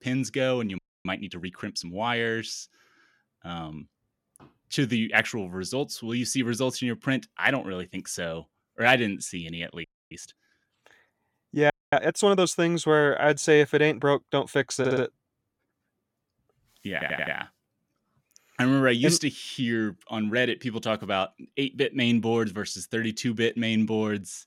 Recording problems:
audio freezing; at 1 s, at 10 s and at 12 s
audio stuttering; at 15 s and at 17 s

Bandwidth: 17 kHz